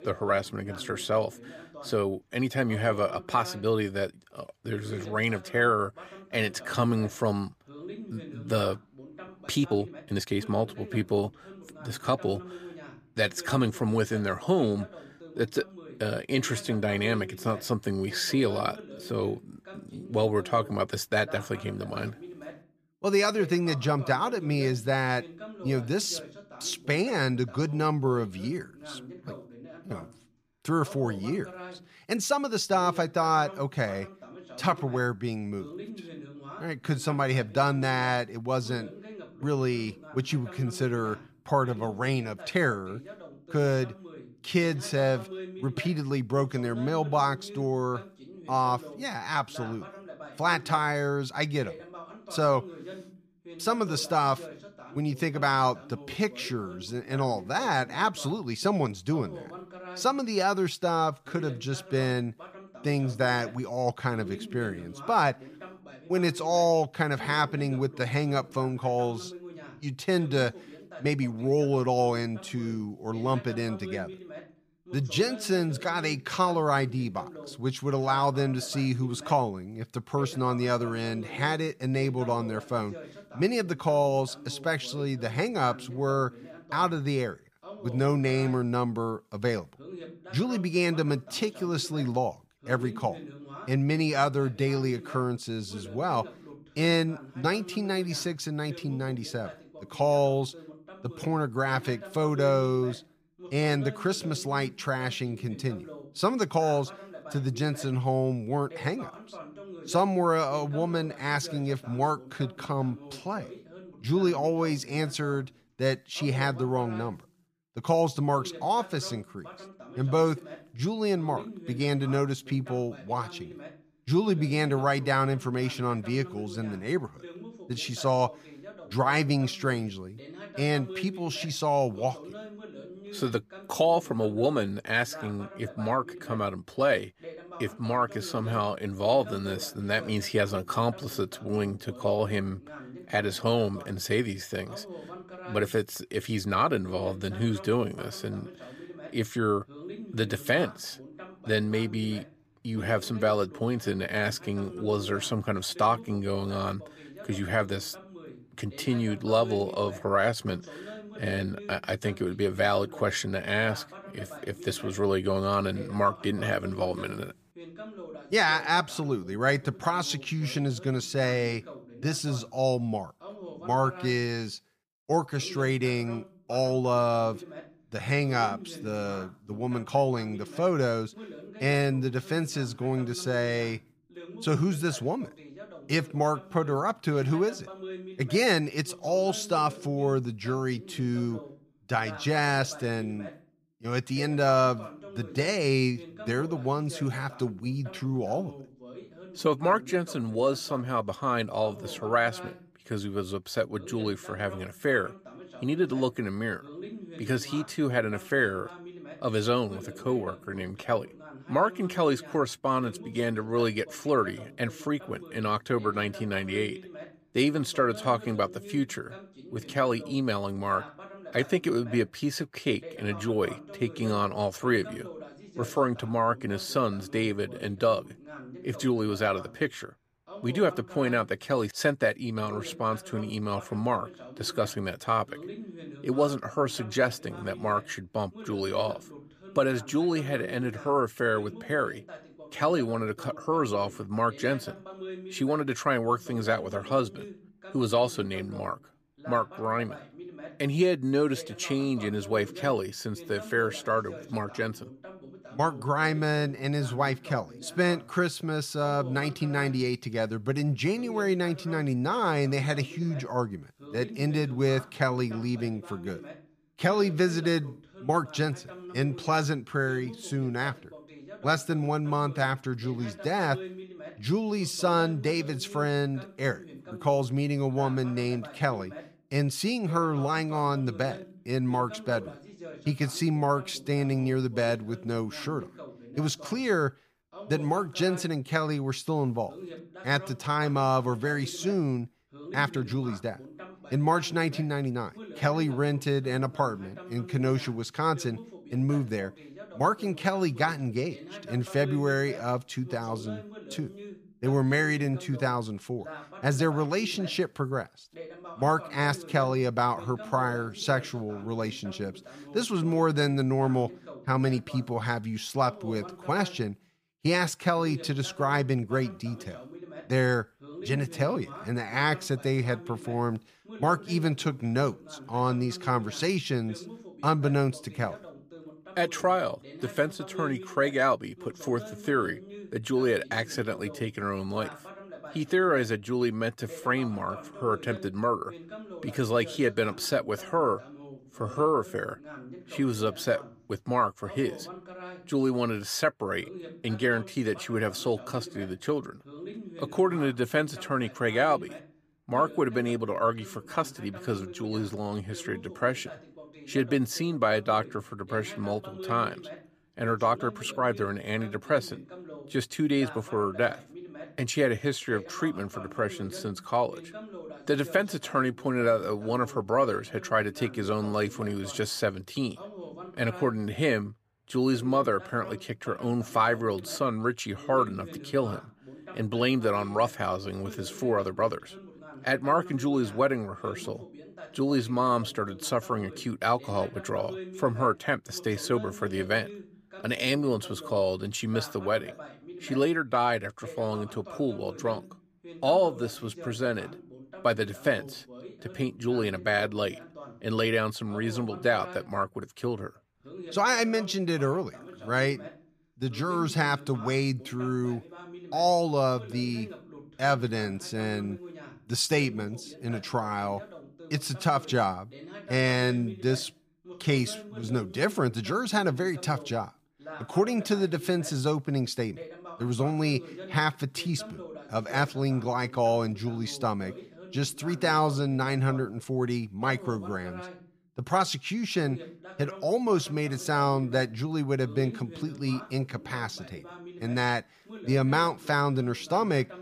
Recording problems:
voice in the background; noticeable; throughout; 15 dB below the speech
uneven, jittery; strongly; from 9.5 s to 6:01

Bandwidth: 15 kHz